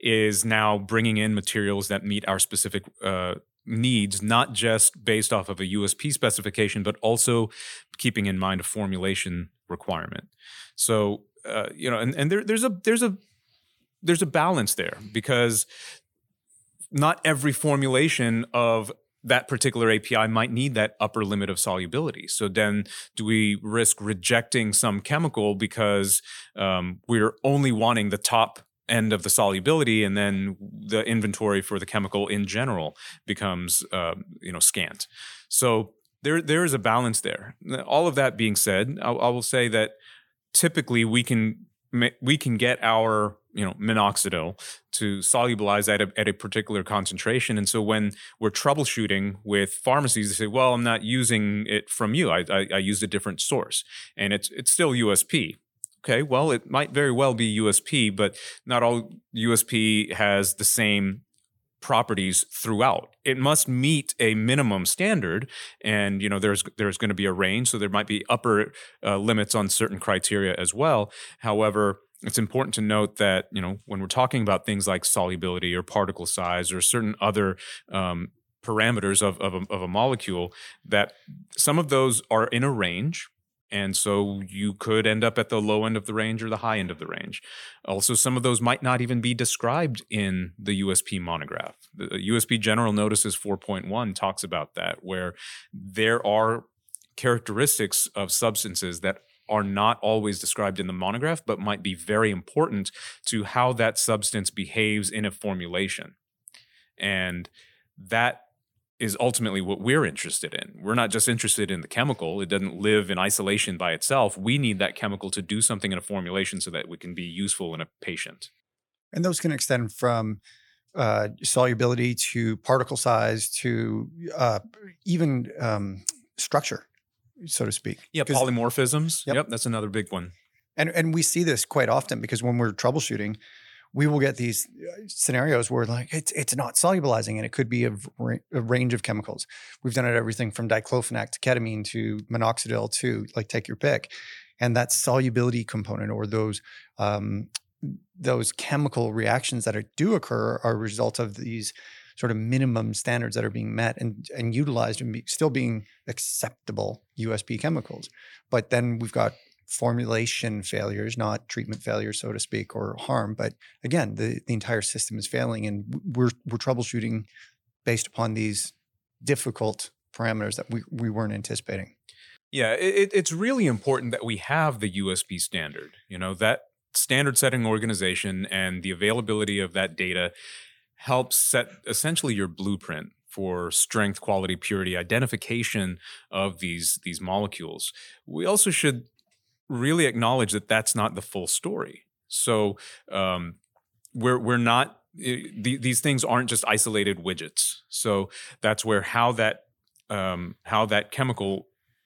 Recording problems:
none

